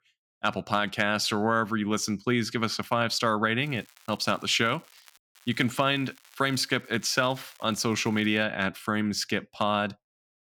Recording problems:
crackling; faint; from 3.5 to 5 s and from 5.5 to 8.5 s; 25 dB below the speech

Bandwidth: 18.5 kHz